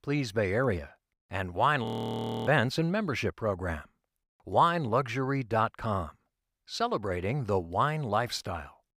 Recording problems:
audio freezing; at 2 s for 0.5 s

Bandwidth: 15.5 kHz